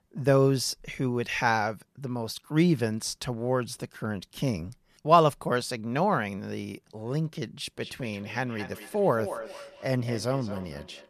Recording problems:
echo of what is said; noticeable; from 7.5 s on; 220 ms later, 15 dB below the speech

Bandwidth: 14 kHz